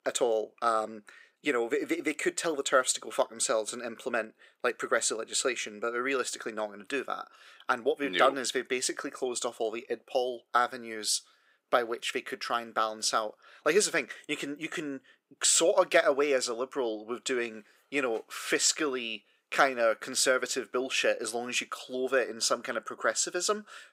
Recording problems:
thin; somewhat; fading below 350 Hz

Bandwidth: 15.5 kHz